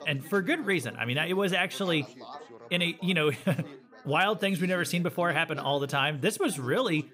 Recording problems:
background chatter; noticeable; throughout; 3 voices, 20 dB below the speech

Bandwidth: 15.5 kHz